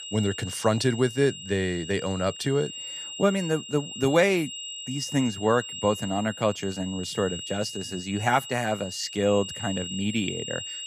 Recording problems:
high-pitched whine; loud; throughout; 3 kHz, 9 dB below the speech

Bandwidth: 15 kHz